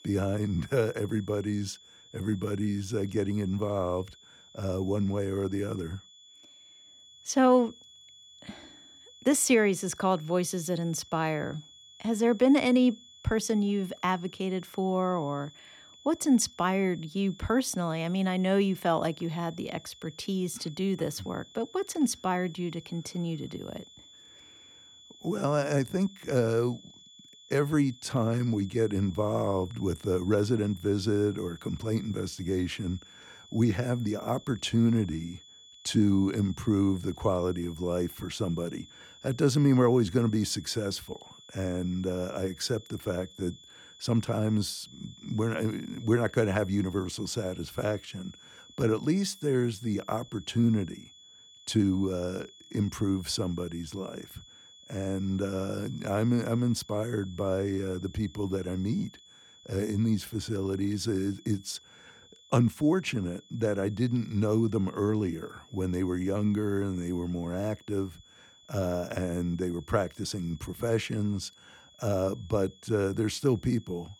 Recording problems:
high-pitched whine; faint; throughout; 3.5 kHz, 20 dB below the speech

